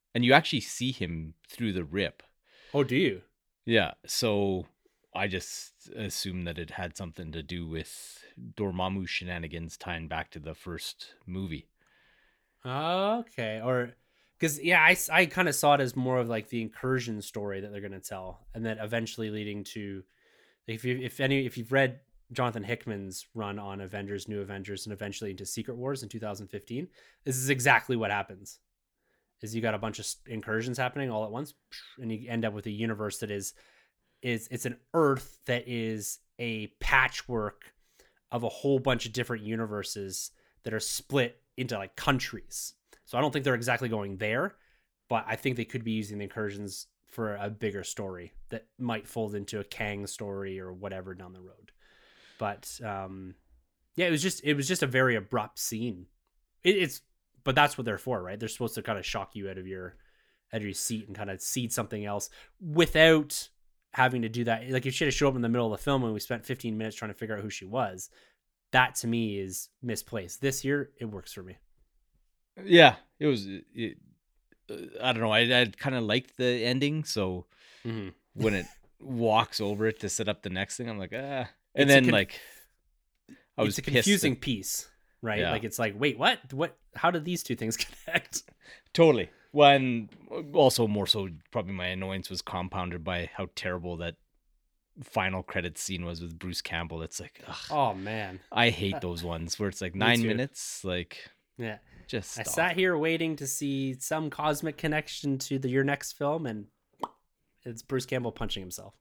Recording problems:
none

